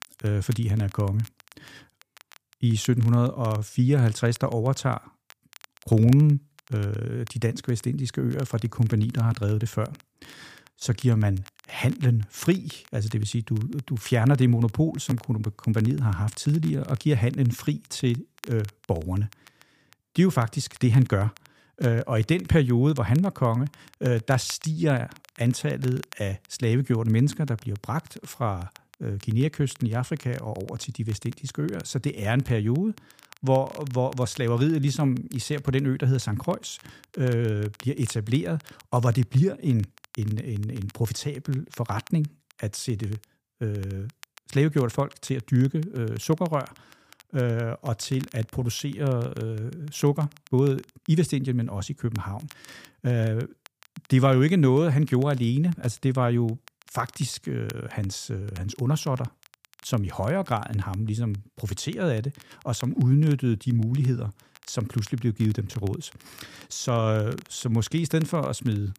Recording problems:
crackle, like an old record; faint; 25 dB below the speech

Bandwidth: 15 kHz